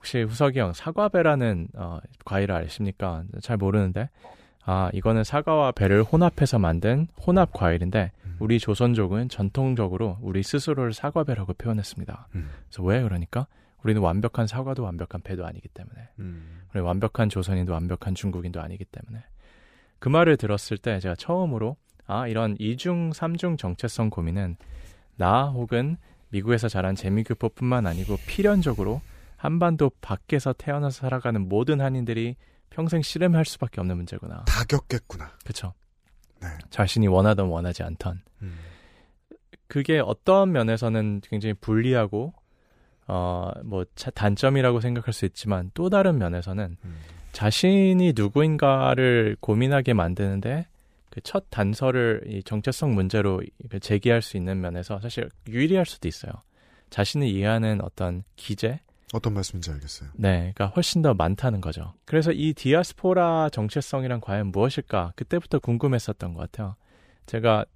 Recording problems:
none

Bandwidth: 15 kHz